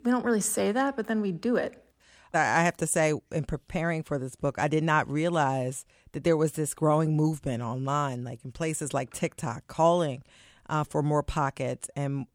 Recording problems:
none

